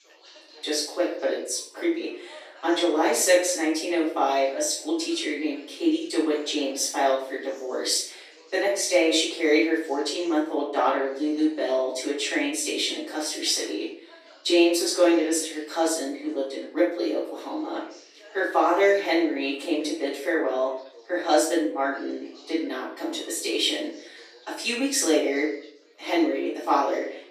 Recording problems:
off-mic speech; far
room echo; noticeable; dies away in 0.5 s
thin; somewhat; fading below 300 Hz
background chatter; faint; throughout; 4 voices, 25 dB below the speech

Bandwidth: 14.5 kHz